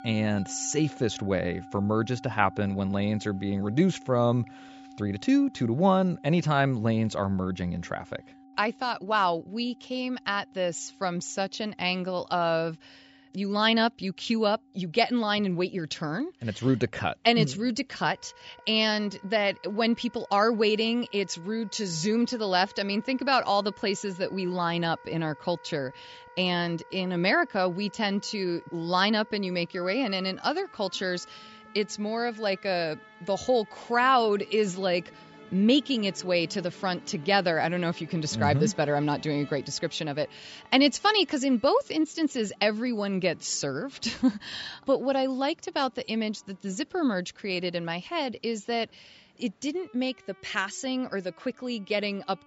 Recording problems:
high frequencies cut off; noticeable; nothing above 8 kHz
background music; faint; throughout; 20 dB below the speech

